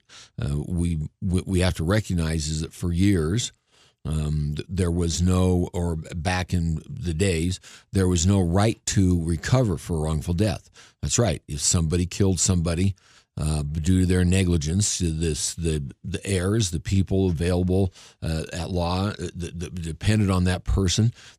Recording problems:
none

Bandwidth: 14.5 kHz